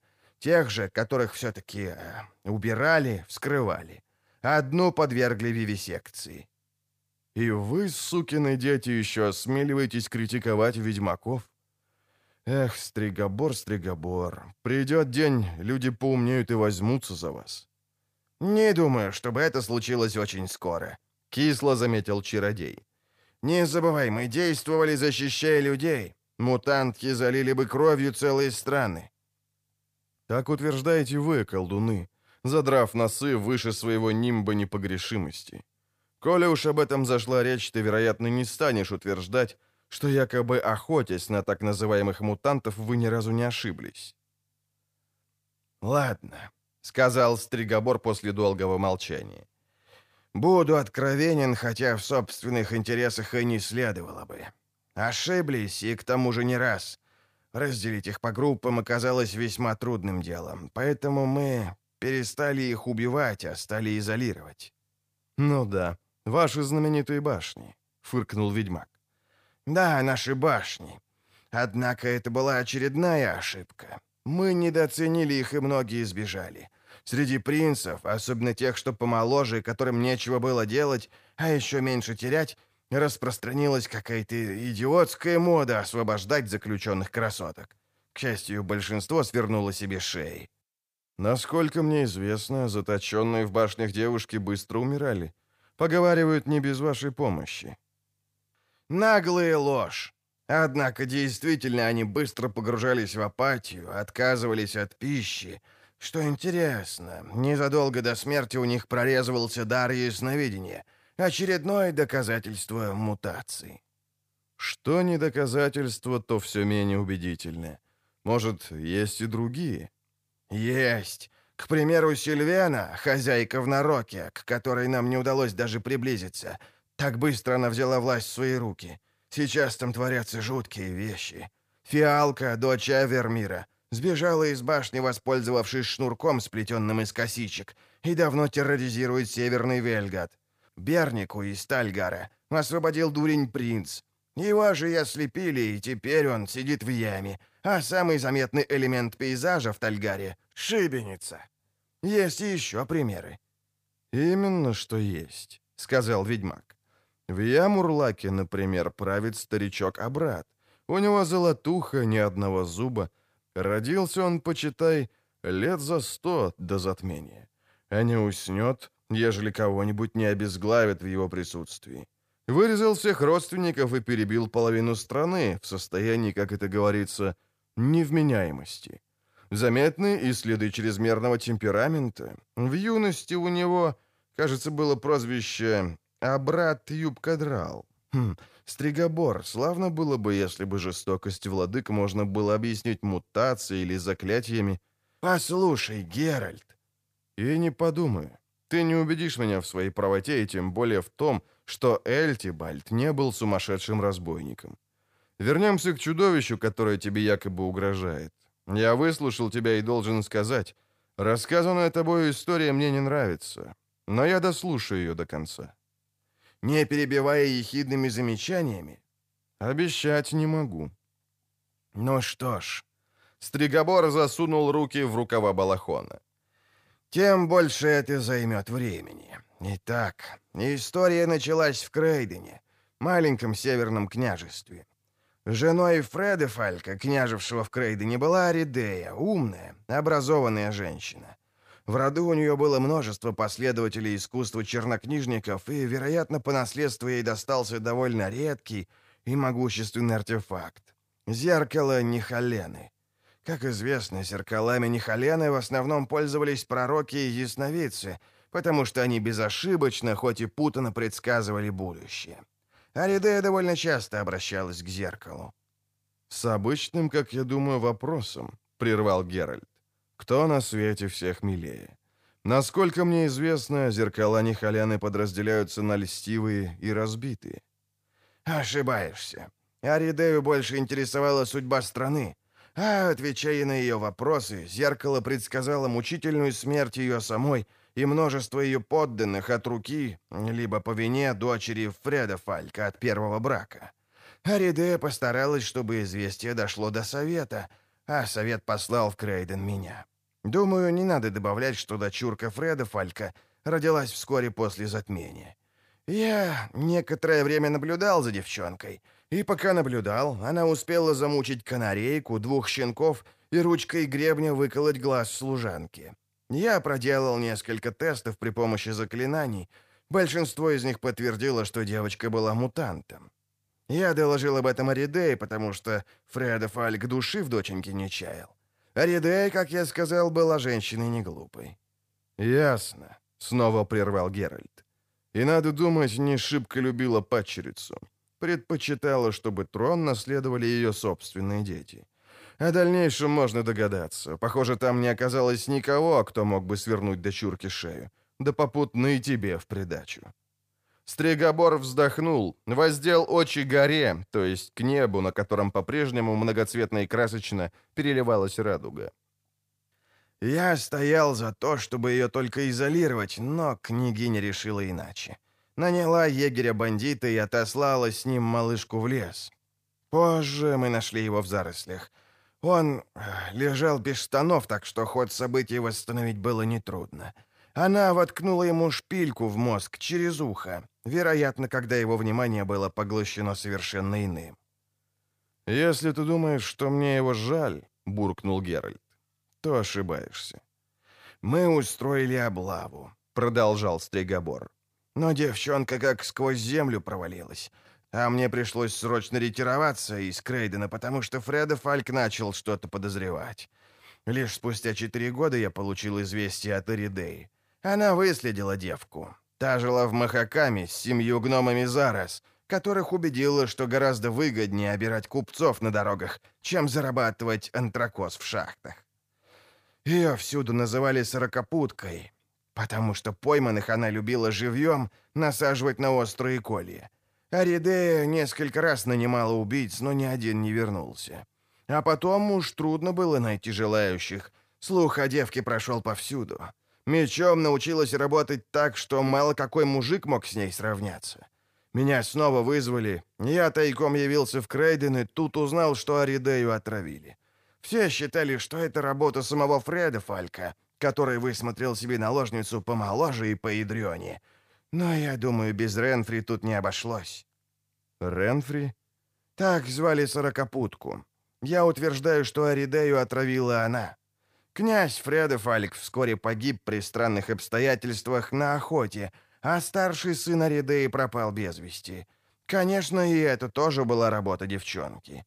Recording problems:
none

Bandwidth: 15 kHz